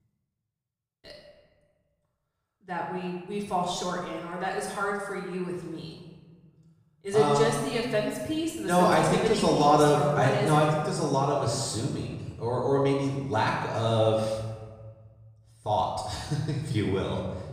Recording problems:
off-mic speech; far
room echo; noticeable; dies away in 1.3 s

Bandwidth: 15 kHz